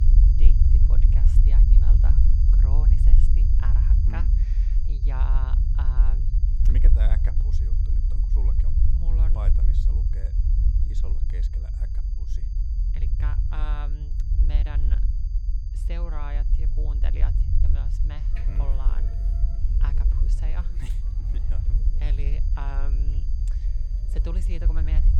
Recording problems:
low rumble; loud; throughout; 1 dB below the speech
high-pitched whine; noticeable; throughout; 4.5 kHz, 20 dB below the speech
background music; noticeable; throughout; 10 dB below the speech

